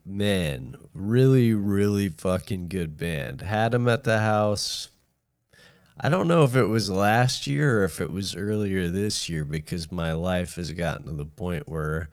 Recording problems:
wrong speed, natural pitch; too slow; 0.6 times normal speed

